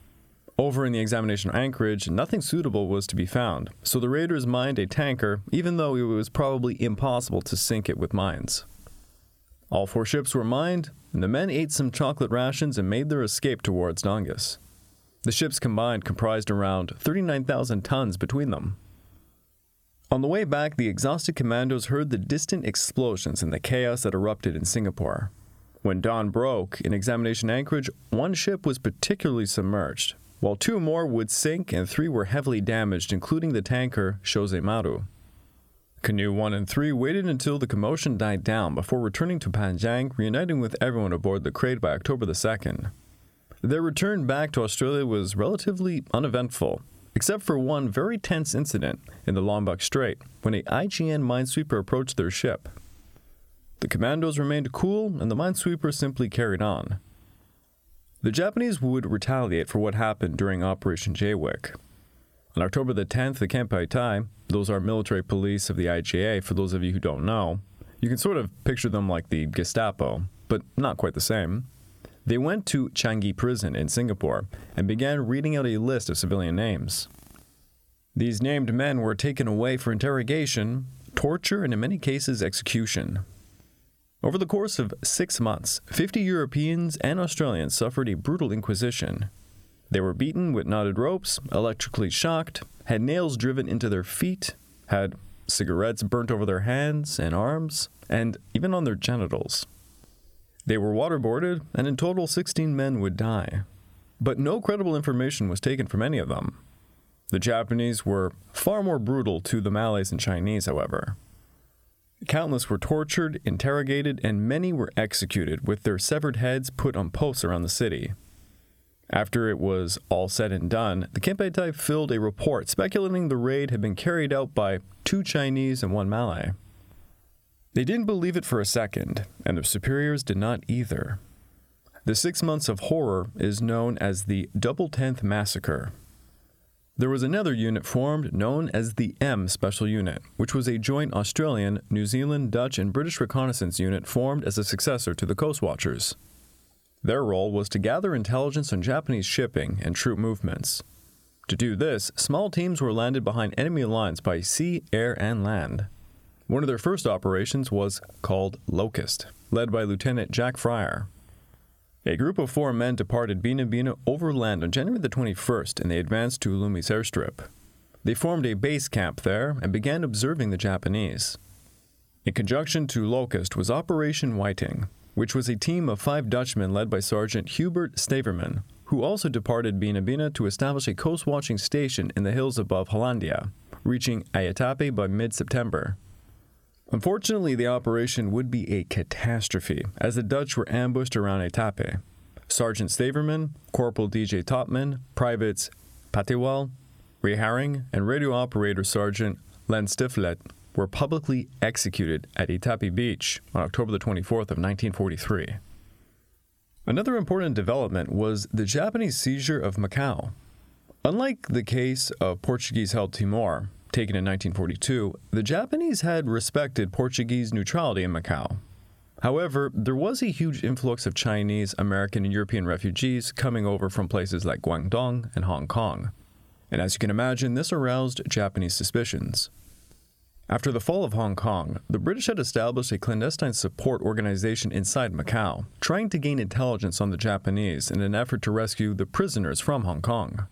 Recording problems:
squashed, flat; somewhat

